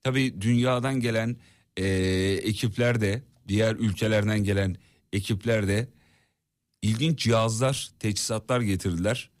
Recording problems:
none

